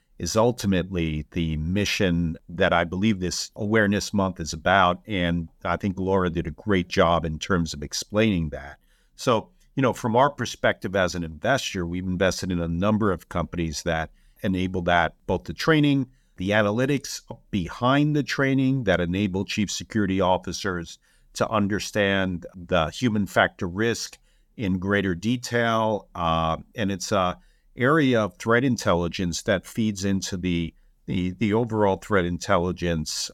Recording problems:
none

